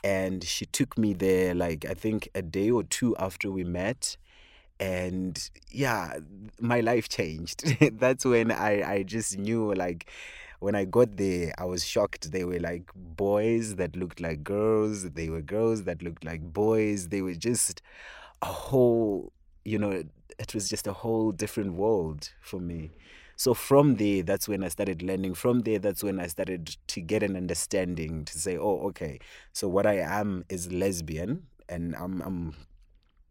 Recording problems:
none

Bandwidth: 16 kHz